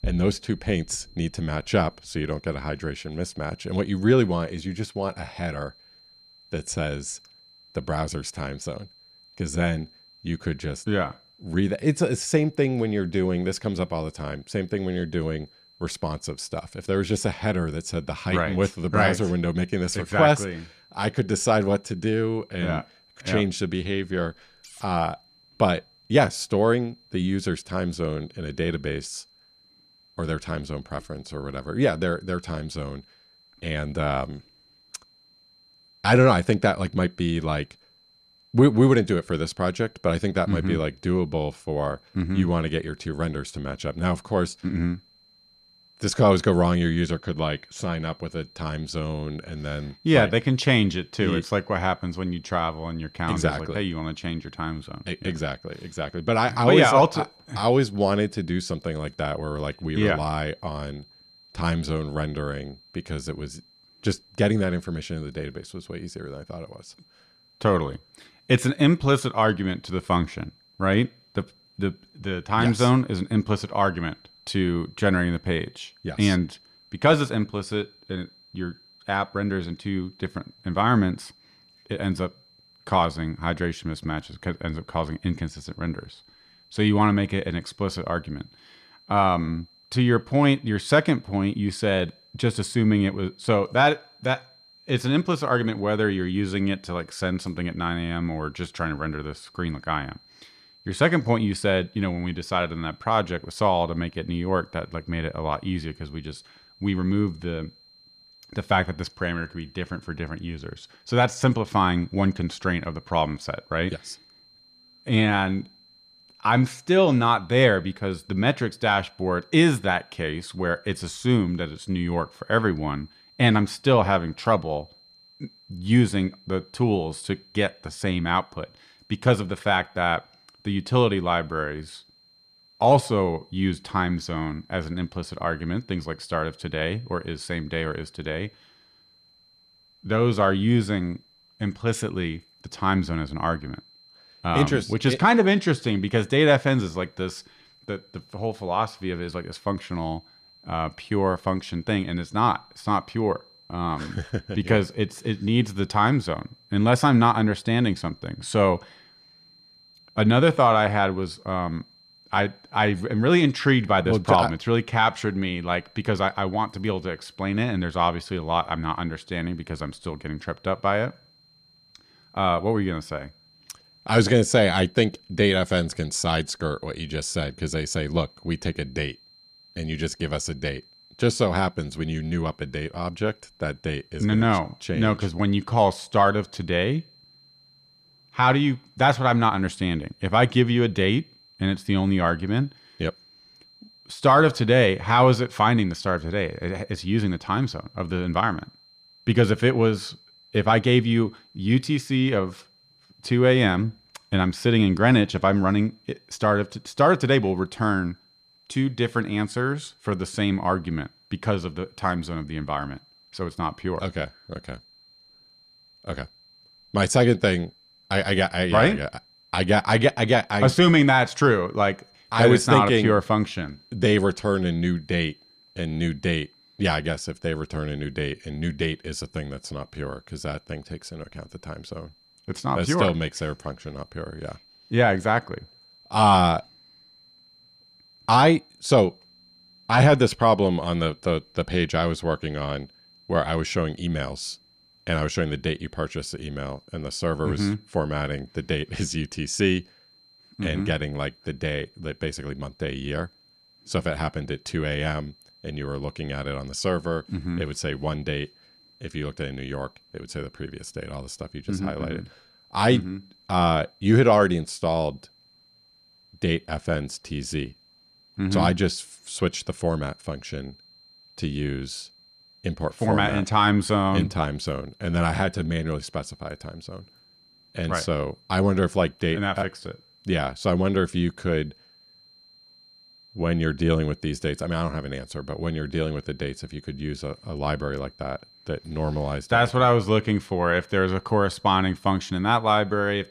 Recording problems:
high-pitched whine; faint; throughout; 4 kHz, 30 dB below the speech

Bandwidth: 14.5 kHz